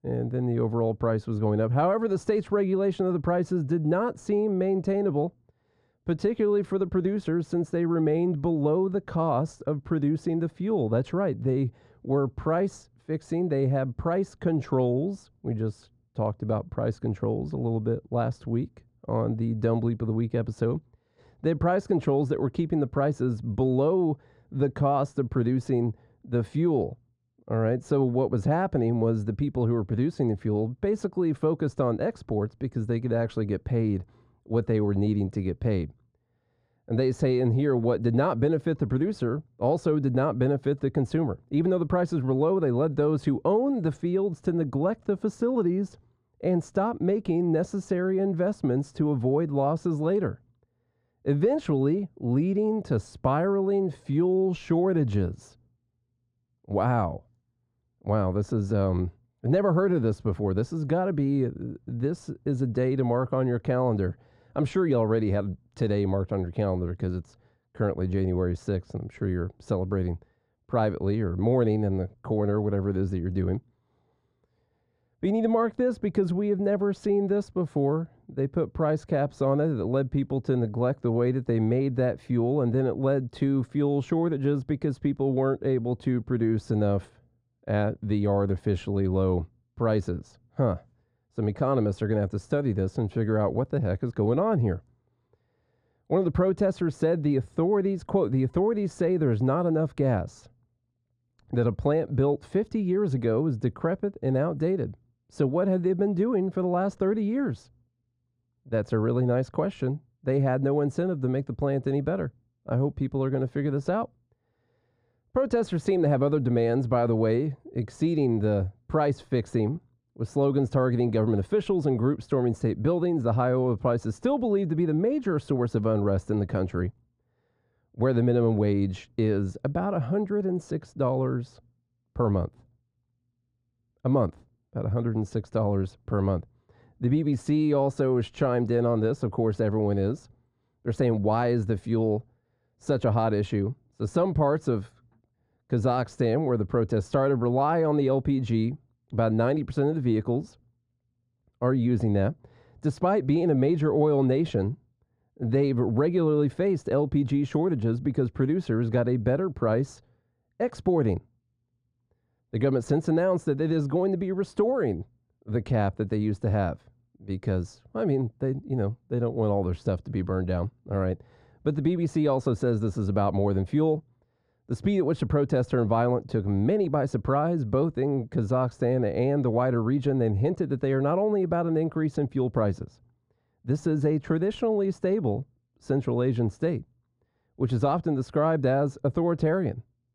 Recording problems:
muffled; very; fading above 2 kHz

